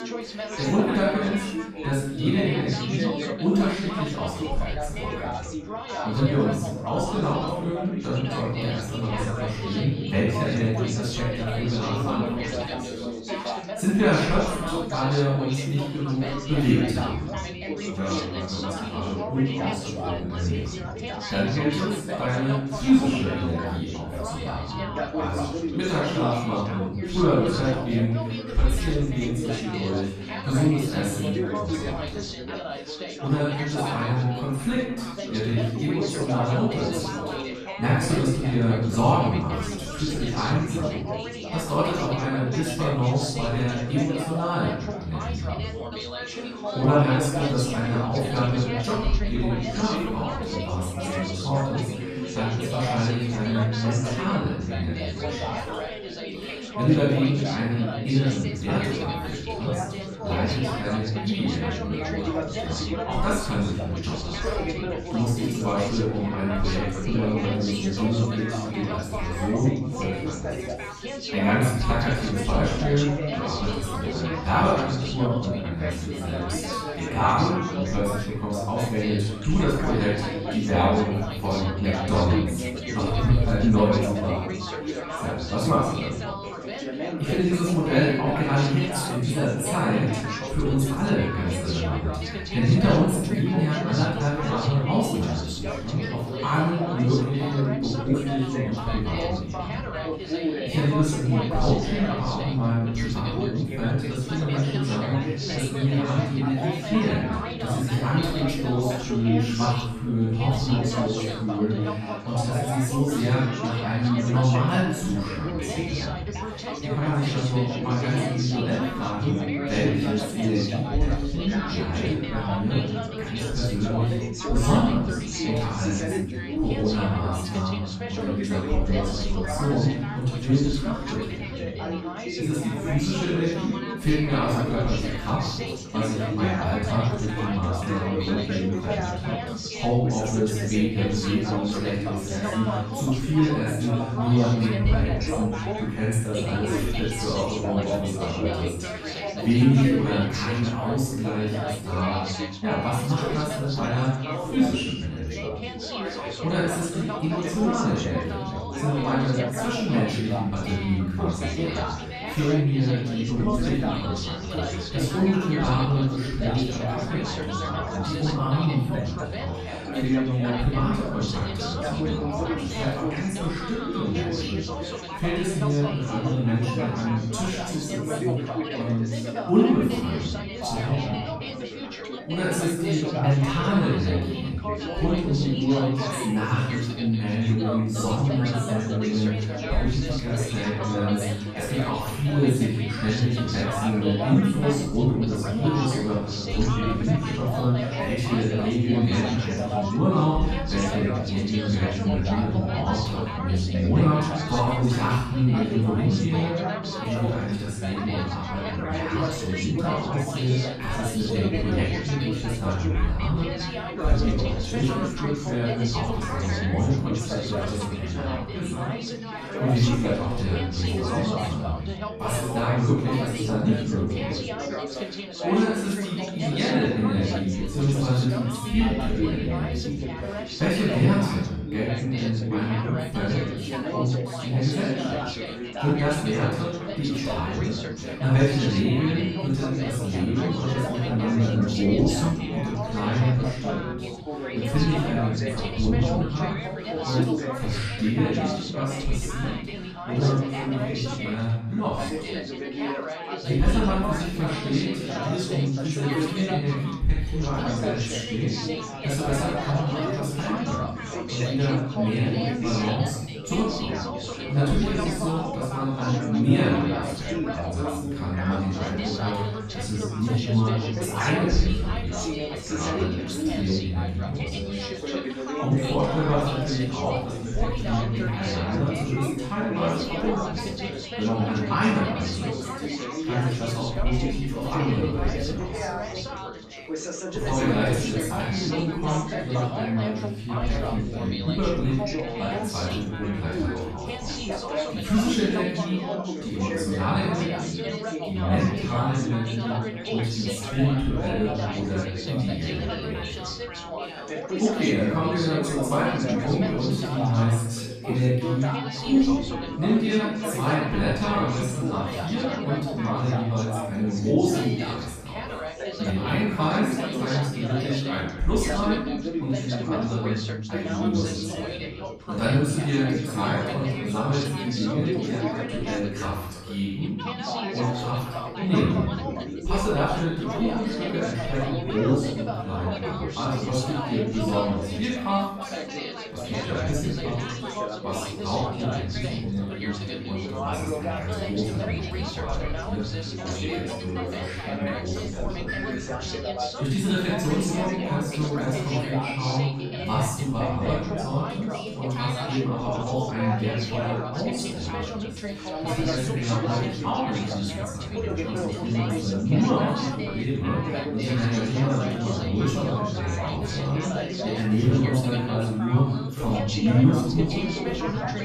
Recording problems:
room echo; strong; dies away in 1 s
off-mic speech; far
background chatter; loud; throughout; 4 voices, 6 dB below the speech

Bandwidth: 14 kHz